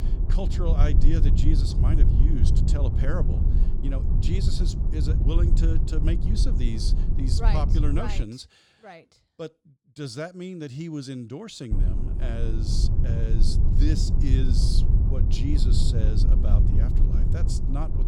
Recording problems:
low rumble; loud; until 8 s and from 12 s on; 3 dB below the speech

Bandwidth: 17.5 kHz